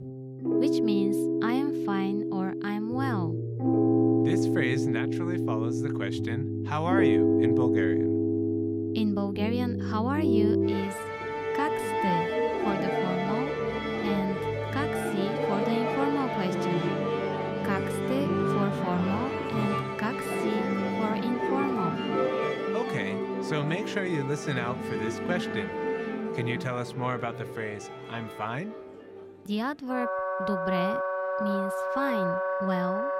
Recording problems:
background music; very loud; throughout; 4 dB above the speech

